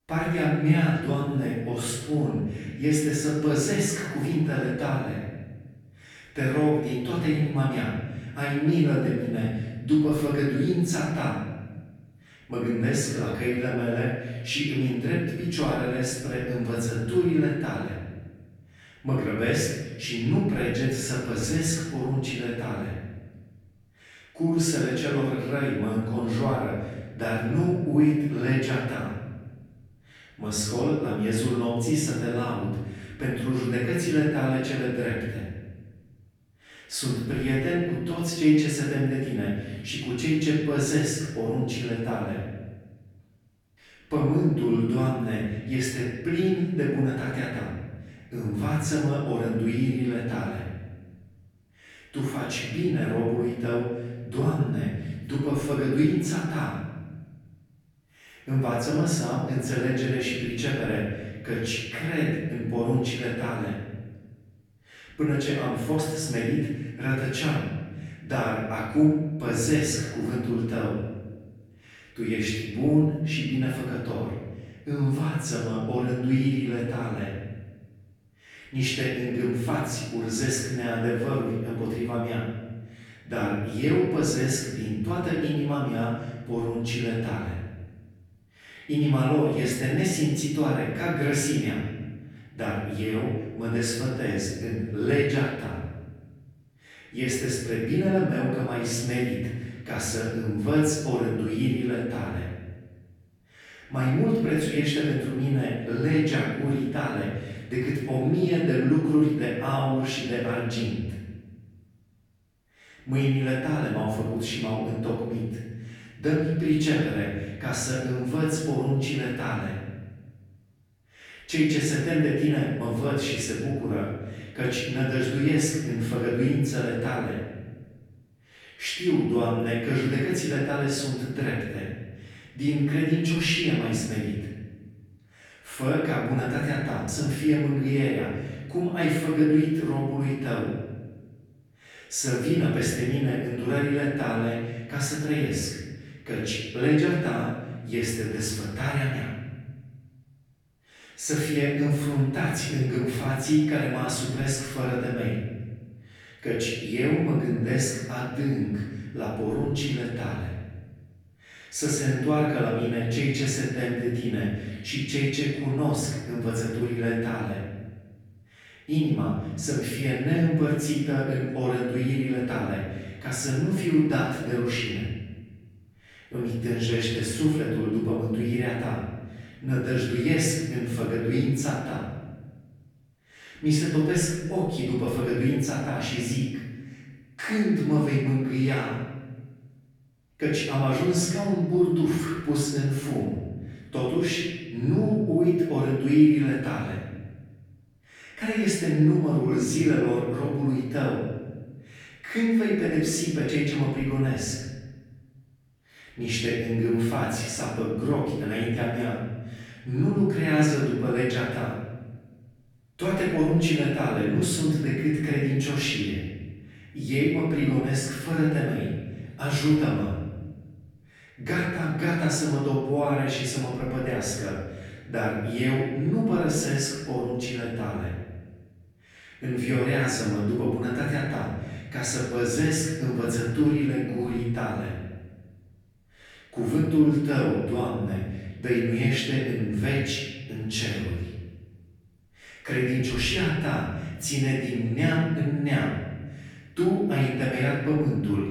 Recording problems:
off-mic speech; far
room echo; noticeable; dies away in 1.2 s

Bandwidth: 18.5 kHz